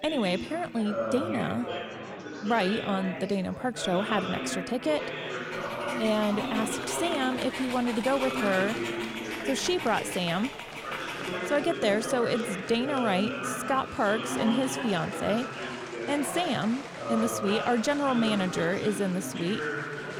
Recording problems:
chatter from many people; loud; throughout; 5 dB below the speech
dog barking; noticeable; from 5.5 to 11 s; peak 8 dB below the speech

